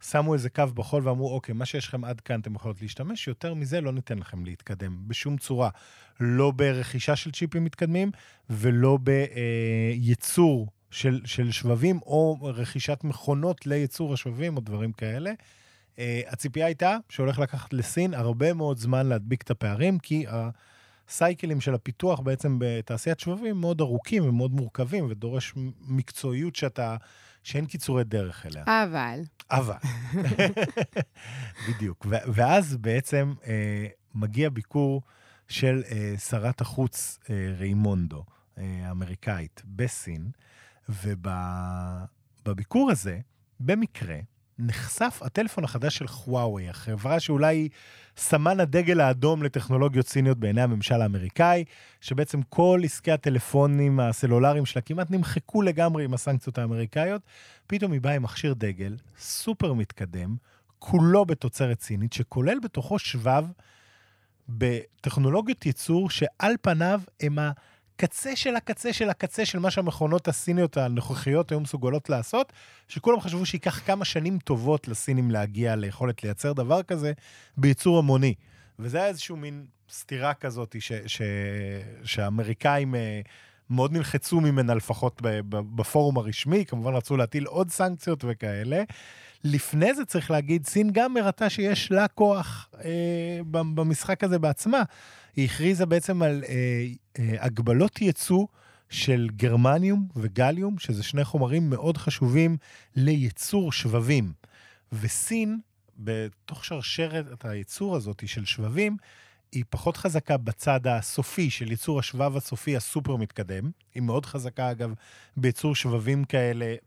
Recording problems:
none

